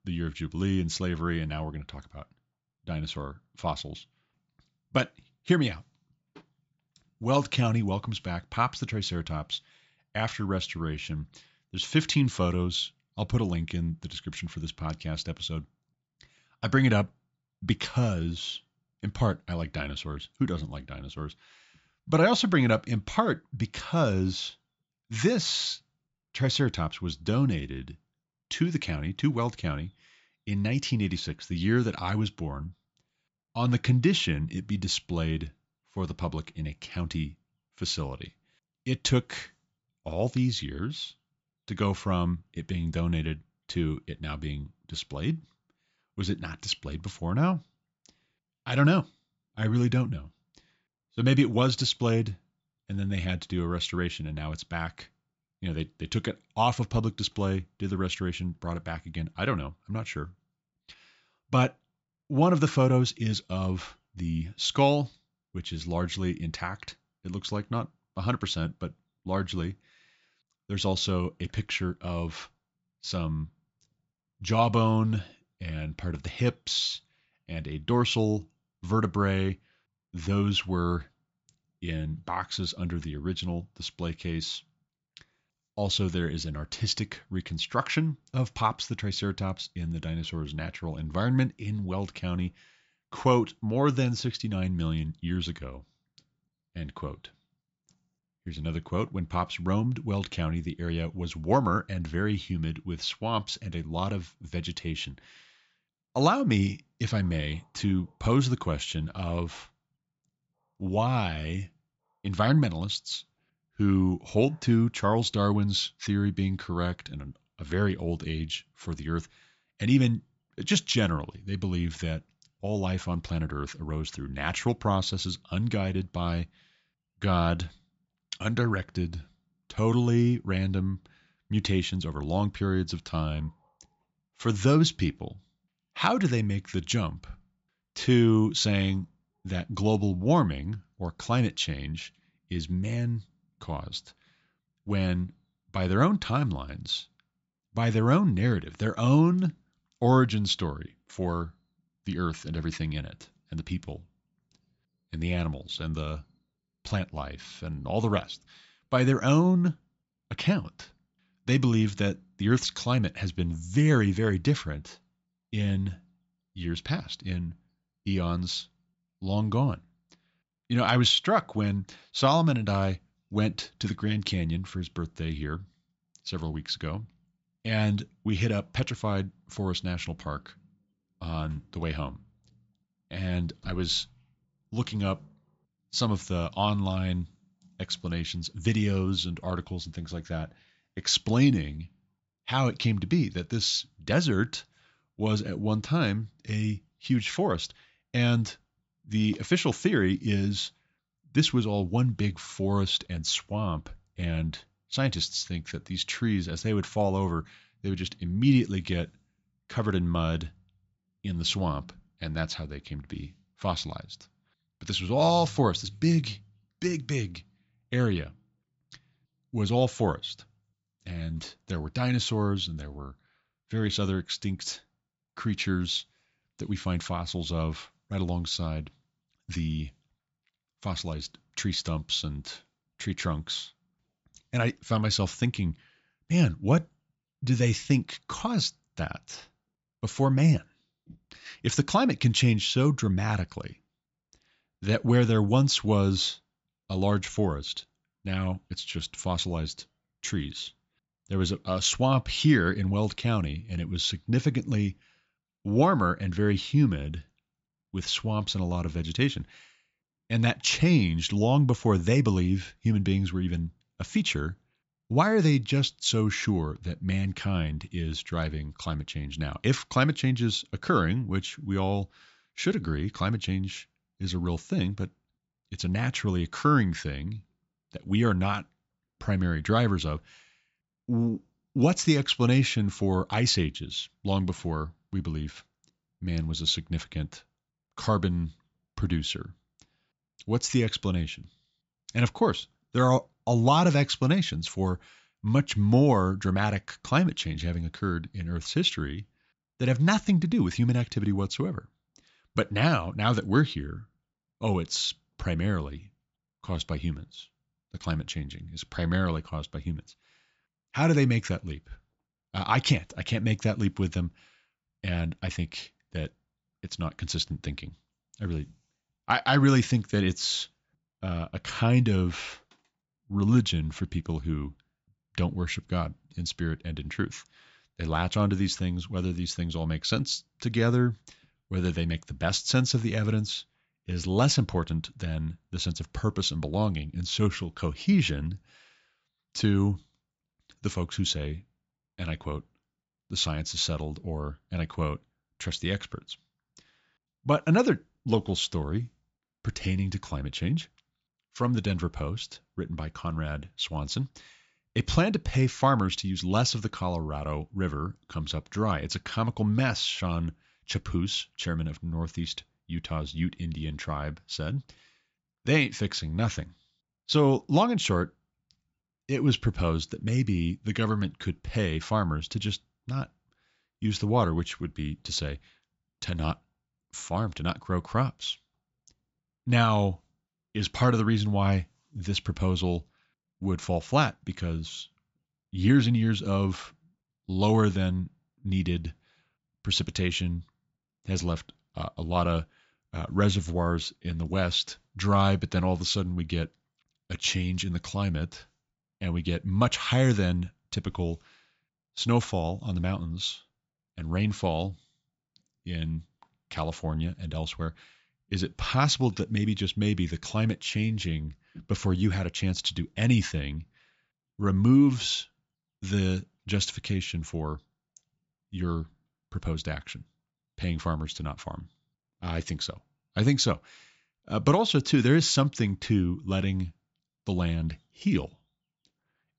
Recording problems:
high frequencies cut off; noticeable; nothing above 8 kHz

